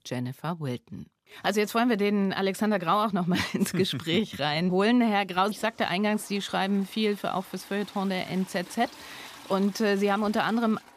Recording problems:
household noises; faint; throughout; 20 dB below the speech

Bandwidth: 15 kHz